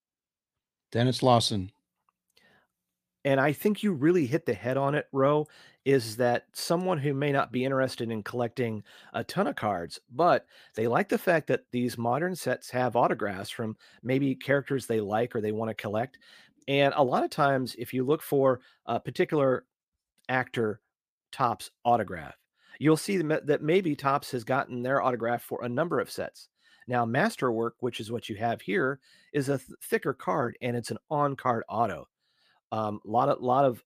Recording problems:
none

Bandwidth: 15 kHz